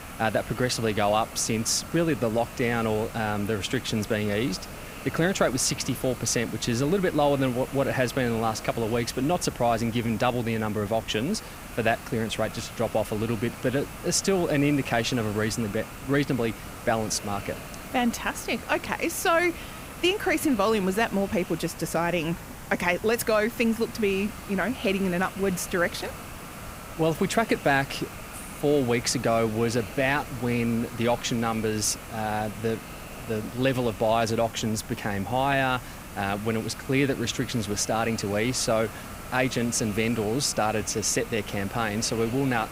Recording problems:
hiss; noticeable; throughout; 15 dB below the speech

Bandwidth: 15.5 kHz